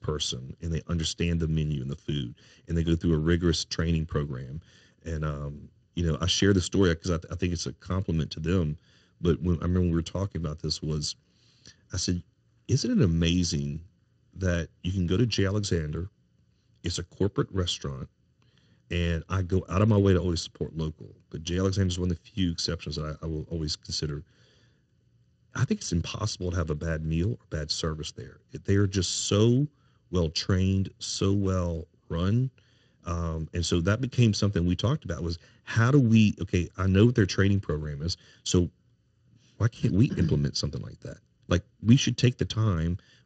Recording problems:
garbled, watery; slightly; nothing above 7.5 kHz

